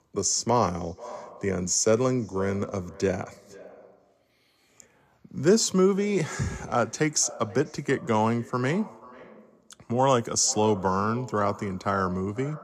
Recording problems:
echo of what is said; faint; throughout; 490 ms later, 20 dB below the speech

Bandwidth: 14.5 kHz